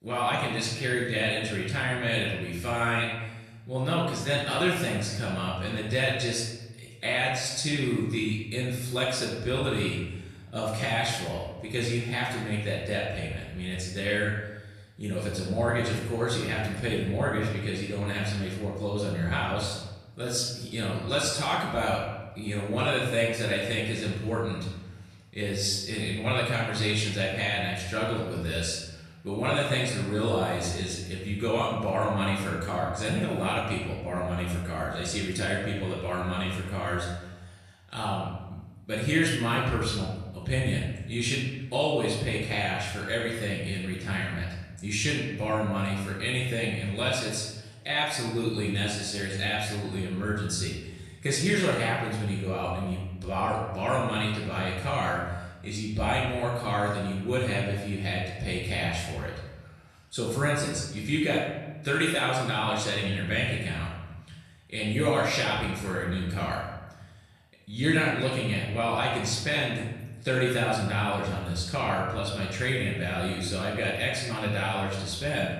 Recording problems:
off-mic speech; far
room echo; noticeable; dies away in 1 s

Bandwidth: 14.5 kHz